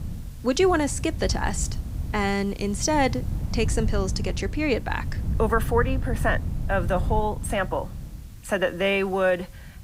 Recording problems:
wind noise on the microphone; occasional gusts; 20 dB below the speech
hiss; faint; throughout; 30 dB below the speech

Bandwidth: 15.5 kHz